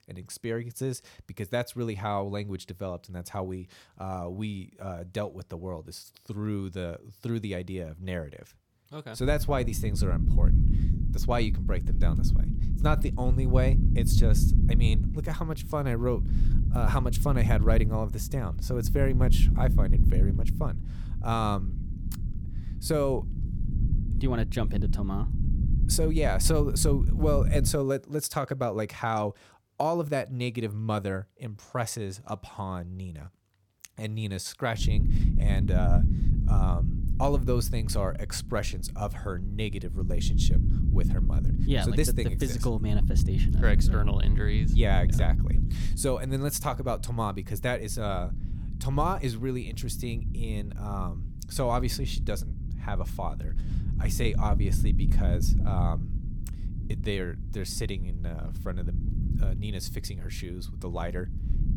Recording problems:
low rumble; loud; from 9 to 28 s and from 35 s on; 10 dB below the speech

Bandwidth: 18 kHz